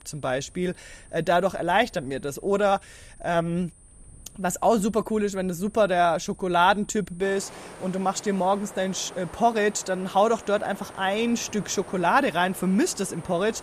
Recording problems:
high-pitched whine; faint; throughout; 9.5 kHz, 30 dB below the speech
wind in the background; faint; throughout; 20 dB below the speech

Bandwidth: 14.5 kHz